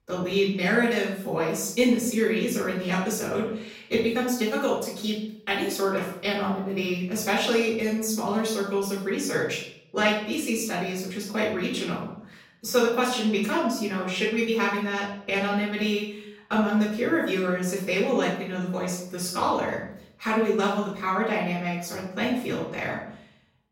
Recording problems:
off-mic speech; far
room echo; noticeable; dies away in 0.6 s

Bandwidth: 16 kHz